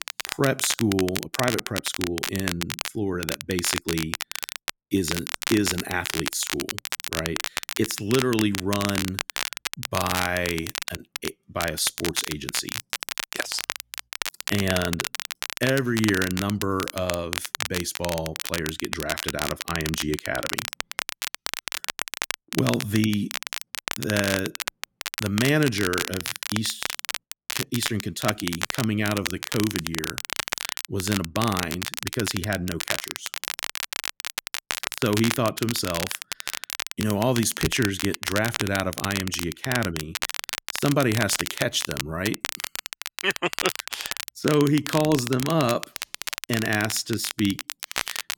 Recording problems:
crackle, like an old record; loud; 4 dB below the speech

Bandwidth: 18 kHz